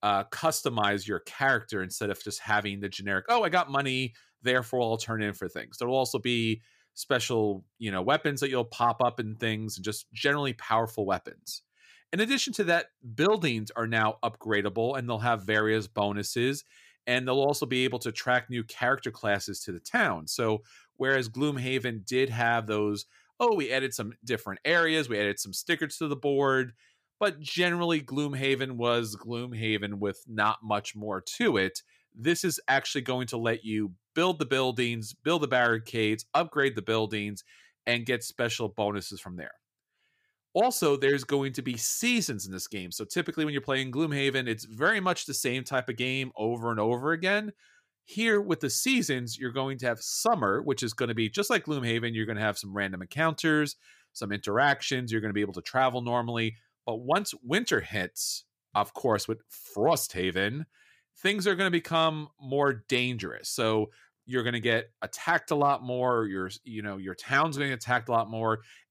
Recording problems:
none

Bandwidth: 15 kHz